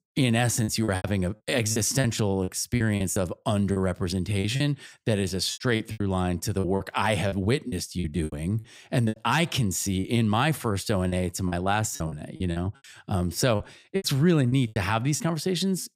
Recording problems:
choppy; very; 11% of the speech affected

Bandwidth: 15.5 kHz